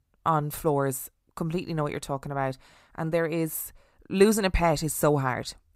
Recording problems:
none

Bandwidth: 15.5 kHz